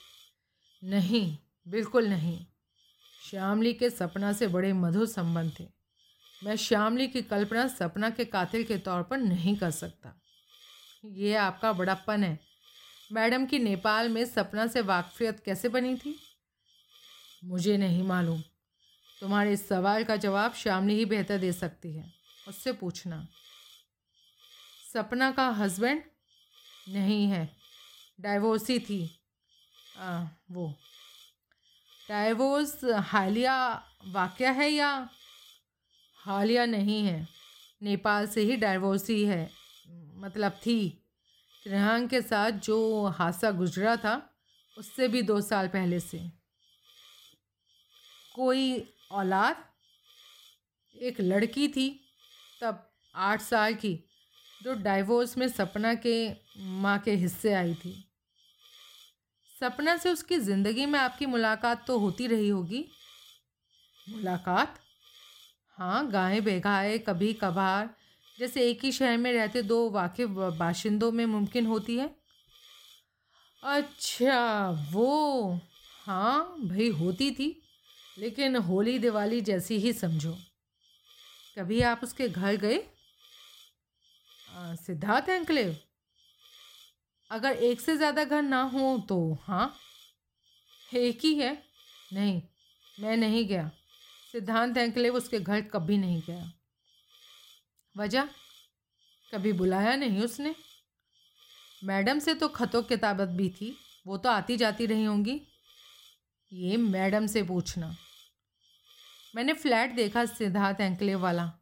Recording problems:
hiss; faint; throughout; 25 dB below the speech

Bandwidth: 16 kHz